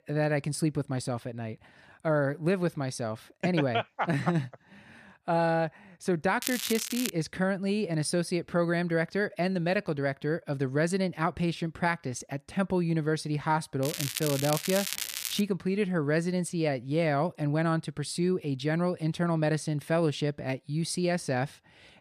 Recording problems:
crackling; loud; at 6.5 s and from 14 to 15 s; 4 dB below the speech

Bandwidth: 14.5 kHz